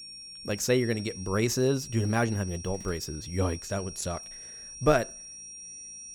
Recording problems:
high-pitched whine; noticeable; throughout; 5.5 kHz, 10 dB below the speech

